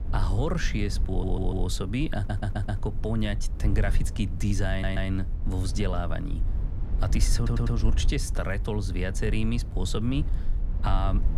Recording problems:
low rumble; noticeable; throughout; 15 dB below the speech
audio stuttering; 4 times, first at 1 s

